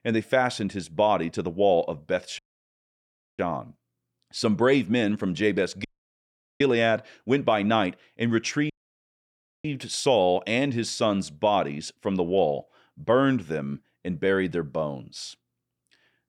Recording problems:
audio cutting out; at 2.5 s for 1 s, at 6 s for 1 s and at 8.5 s for 1 s

